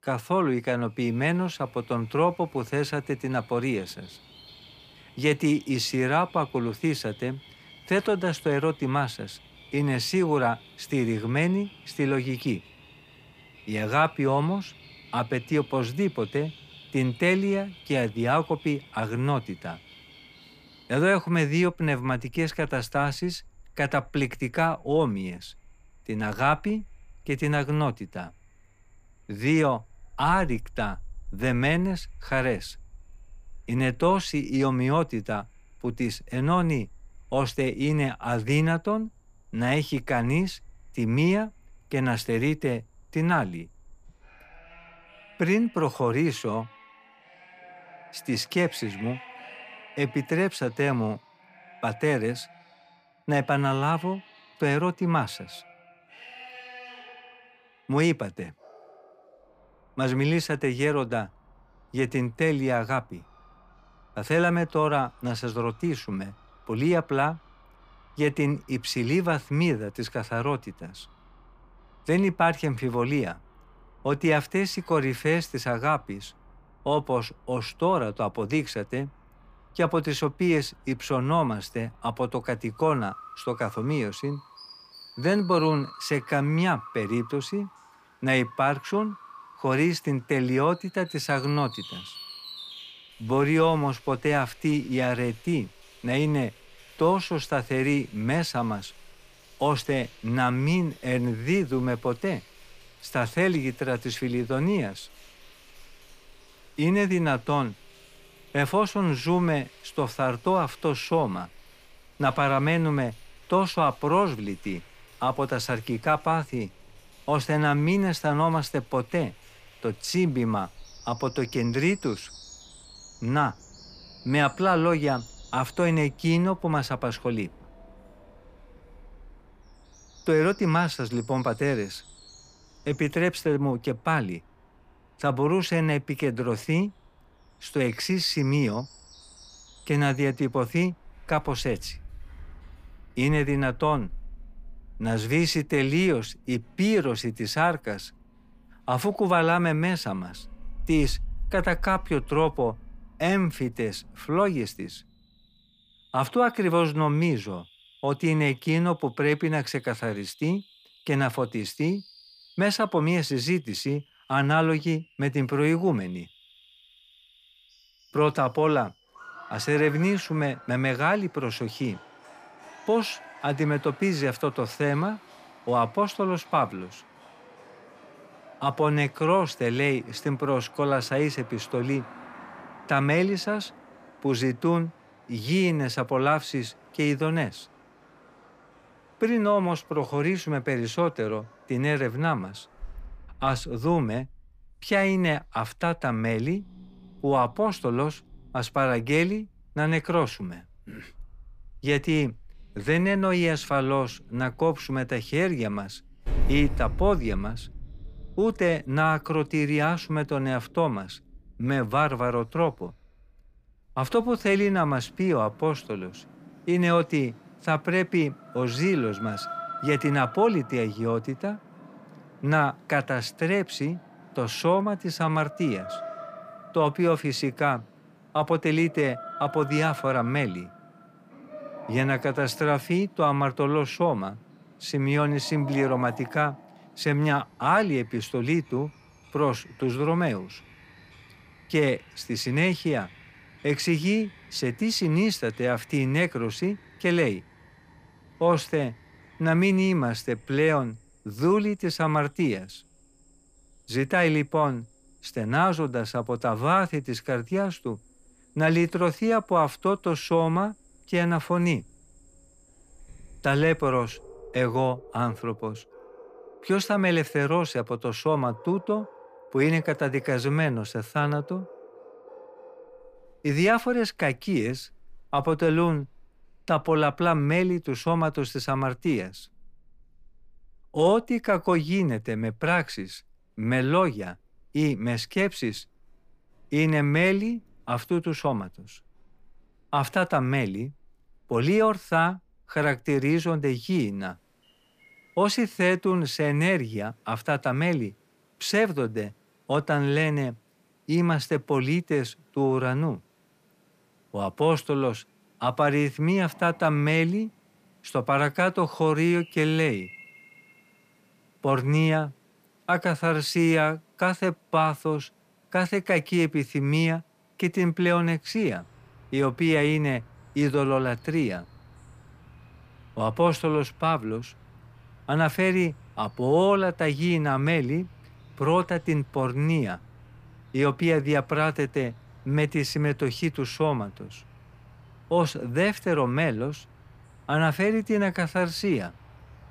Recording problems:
animal sounds; faint; throughout; 20 dB below the speech

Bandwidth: 15 kHz